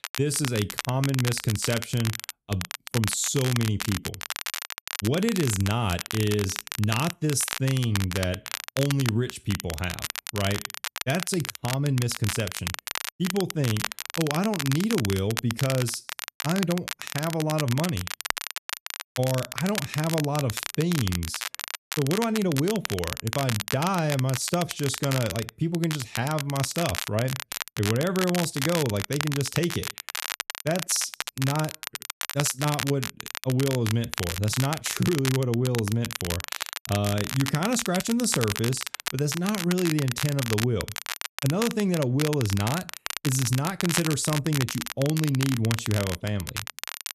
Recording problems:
crackle, like an old record; loud; 5 dB below the speech

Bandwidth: 14 kHz